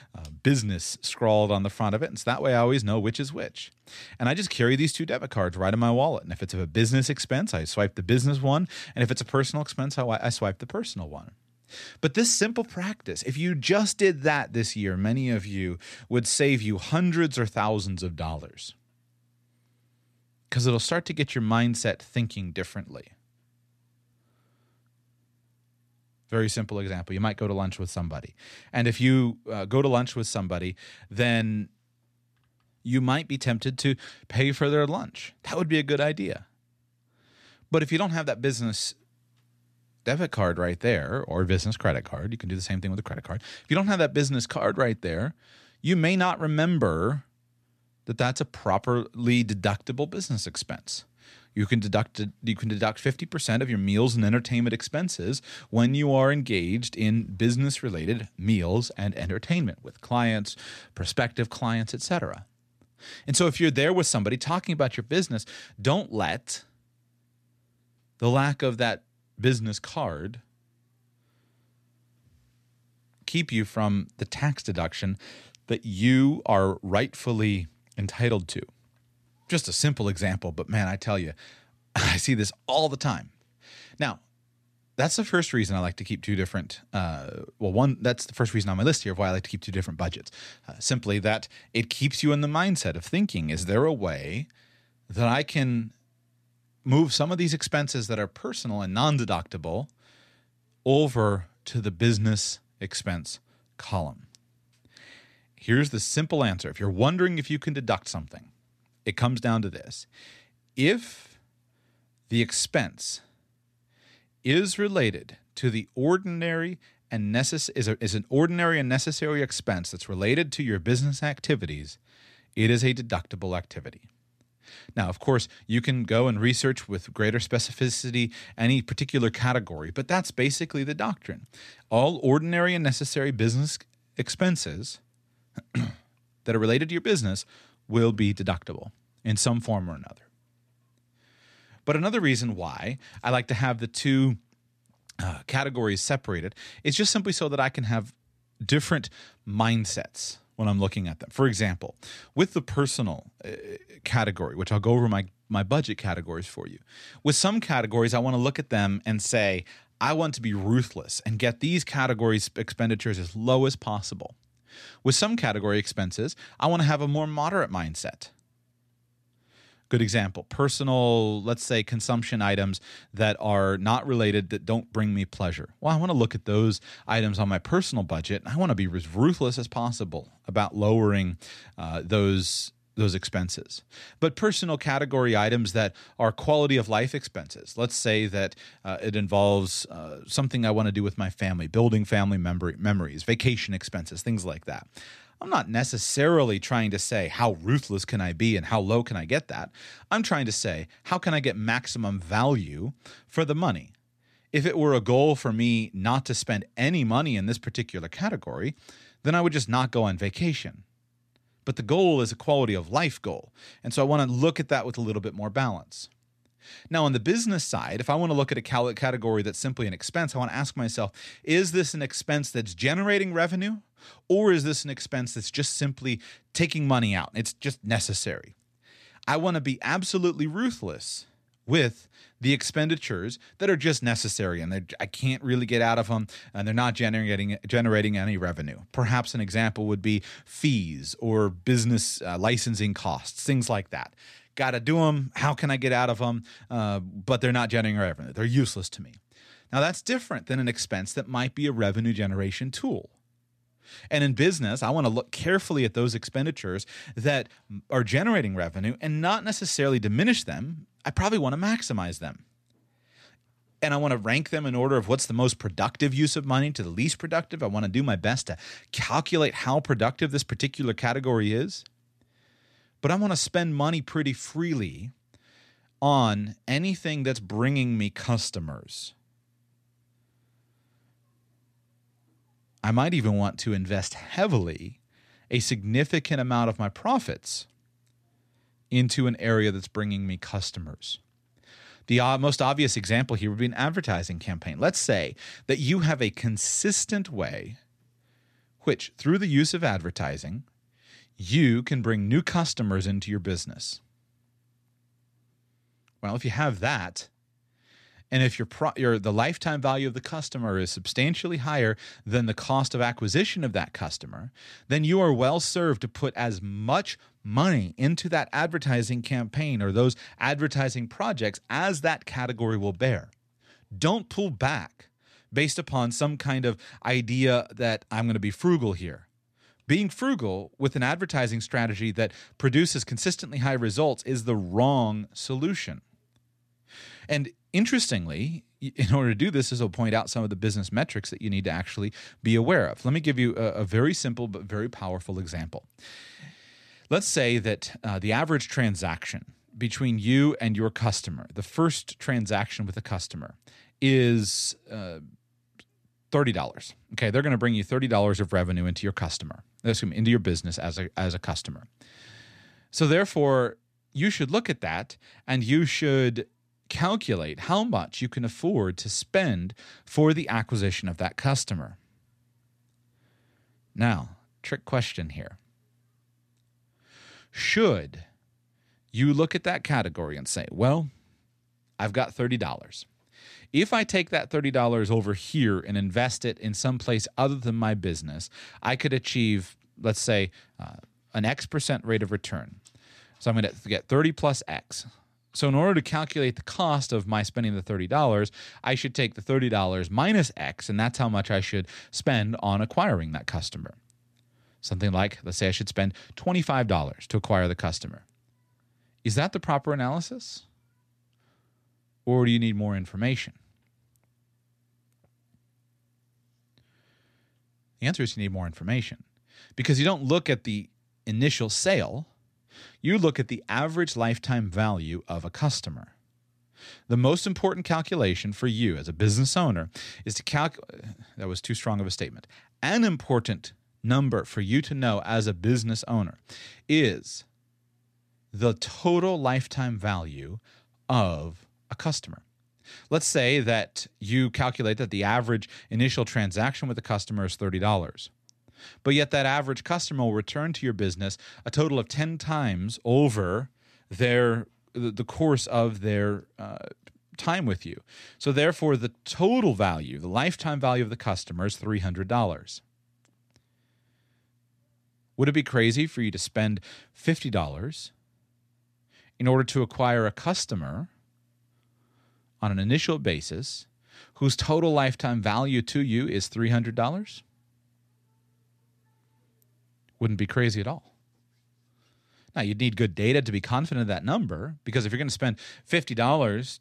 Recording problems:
none

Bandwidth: 14 kHz